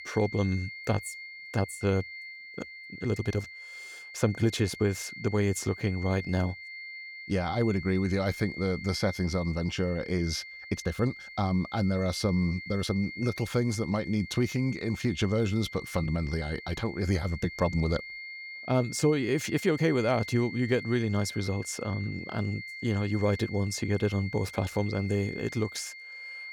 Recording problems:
high-pitched whine; noticeable; throughout; 2 kHz, 10 dB below the speech
uneven, jittery; strongly; from 1.5 to 20 s

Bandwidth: 19 kHz